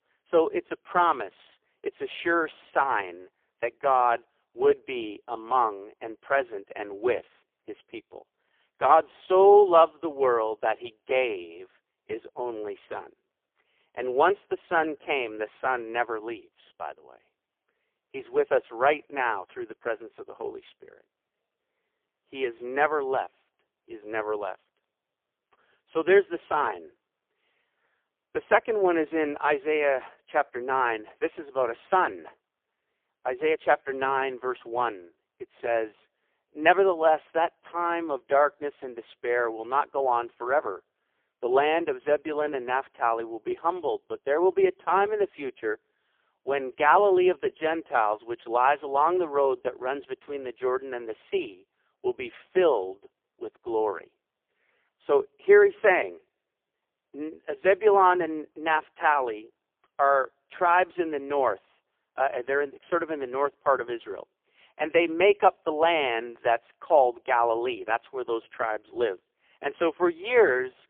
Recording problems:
phone-call audio; poor line; nothing above 3 kHz

